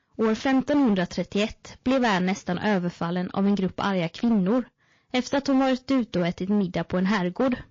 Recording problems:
distortion; slight; 12% of the sound clipped
garbled, watery; slightly; nothing above 6.5 kHz

